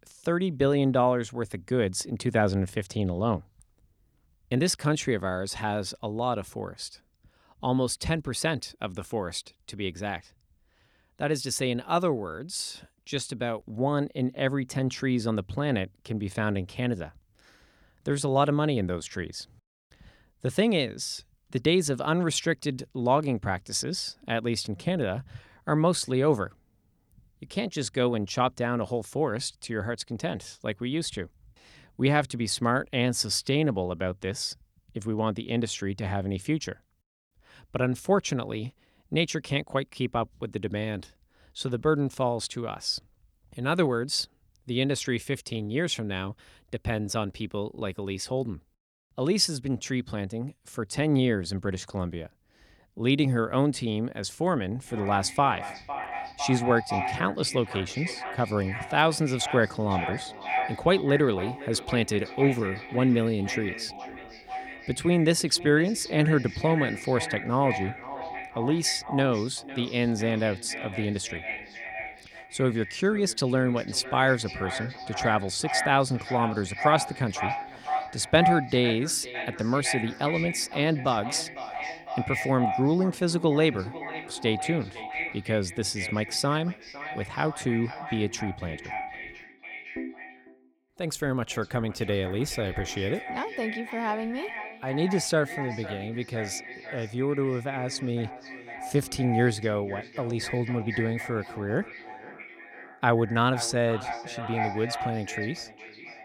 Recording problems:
echo of what is said; strong; from 55 s on; 500 ms later, 8 dB below the speech

